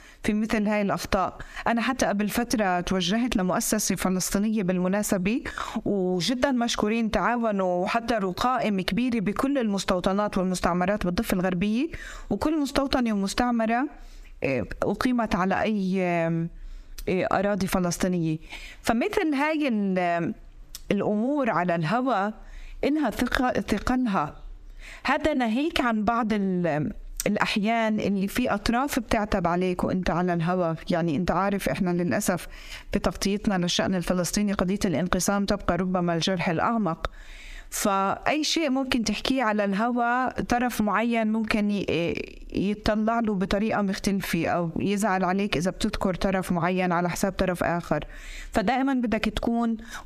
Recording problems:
squashed, flat; heavily

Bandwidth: 14.5 kHz